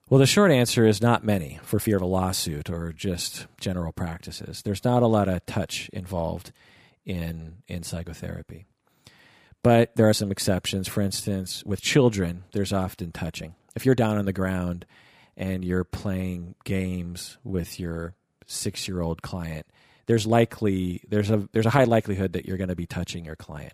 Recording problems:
uneven, jittery; strongly; from 1.5 to 23 s

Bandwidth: 15 kHz